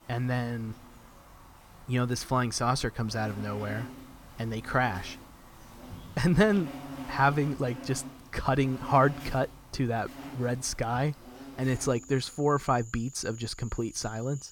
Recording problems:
animal sounds; noticeable; throughout; 15 dB below the speech

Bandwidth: 18.5 kHz